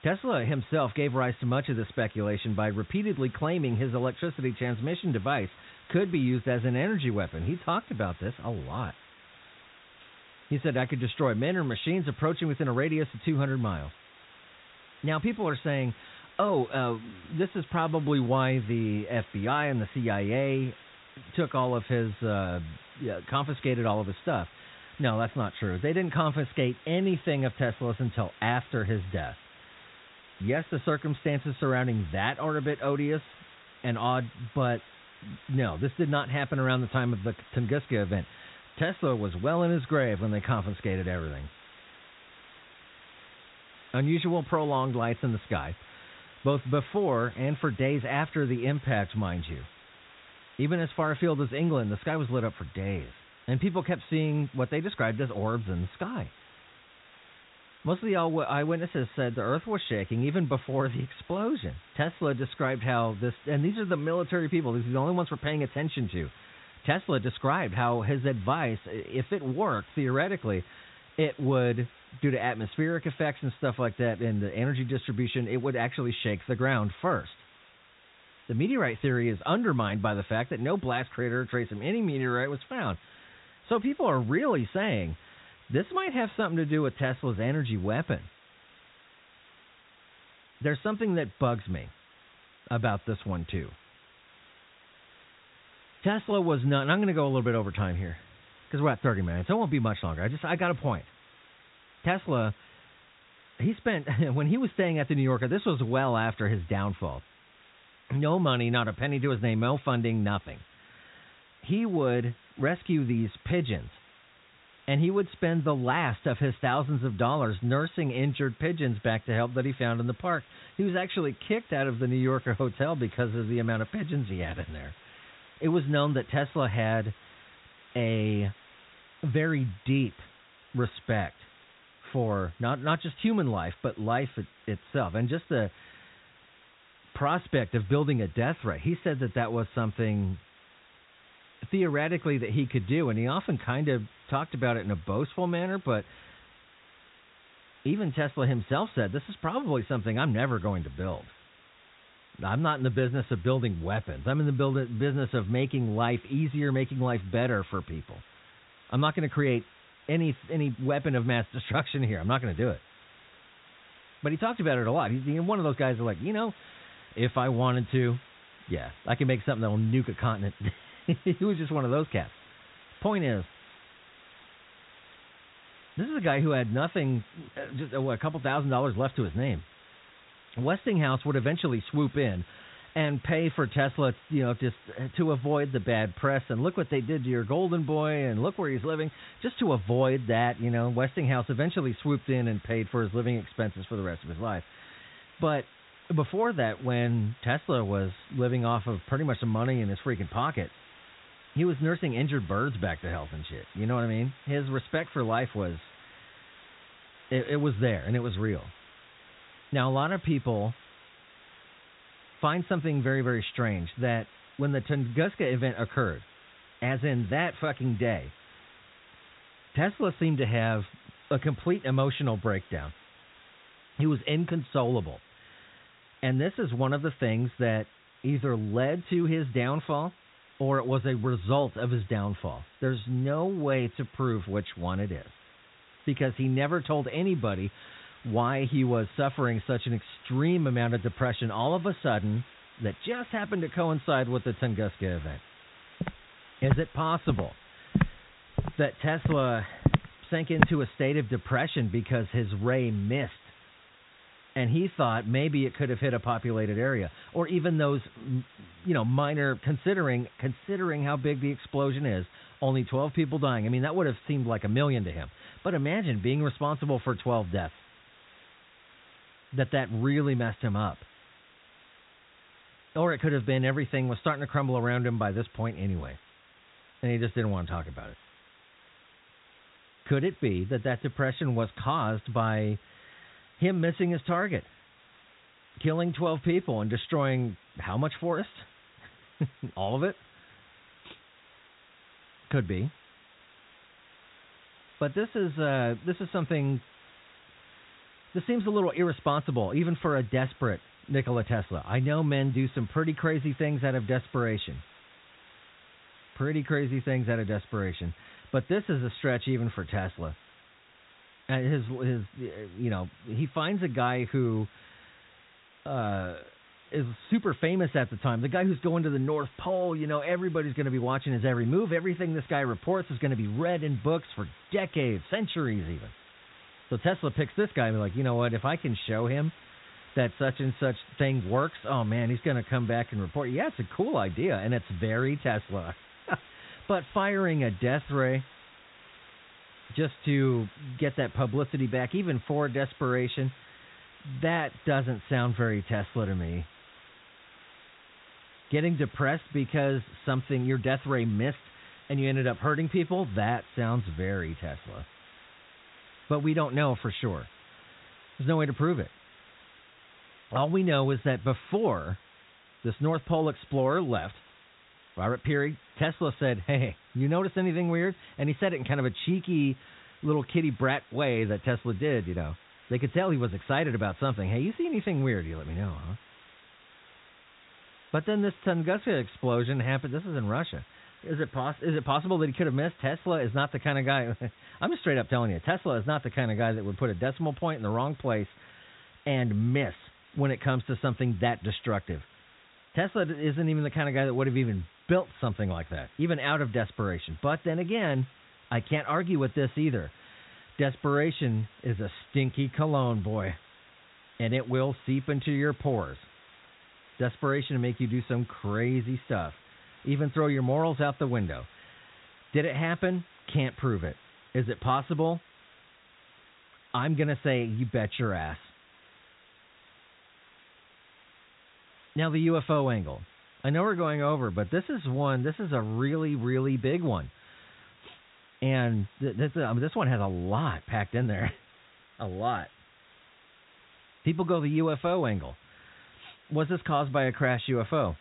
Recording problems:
high frequencies cut off; severe; nothing above 4 kHz
hiss; faint; throughout; 25 dB below the speech
footsteps; loud; from 4:06 to 4:11; peak 4 dB above the speech

